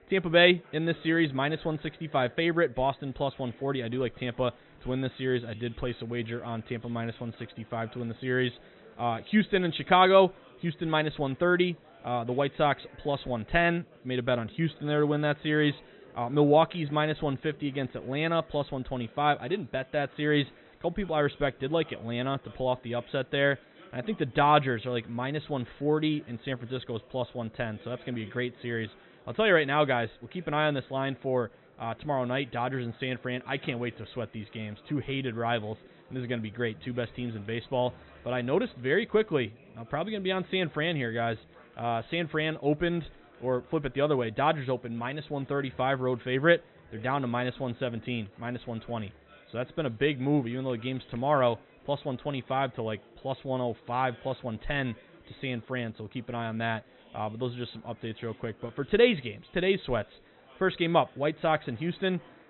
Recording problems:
high frequencies cut off; severe; nothing above 4 kHz
murmuring crowd; faint; throughout; 25 dB below the speech

